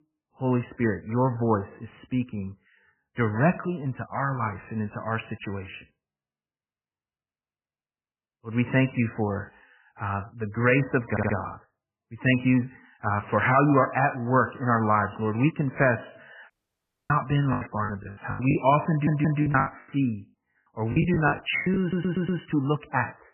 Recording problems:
garbled, watery; badly; nothing above 3 kHz
audio stuttering; at 11 s, at 19 s and at 22 s
audio cutting out; at 17 s for 0.5 s
choppy; very; from 18 to 22 s; 22% of the speech affected

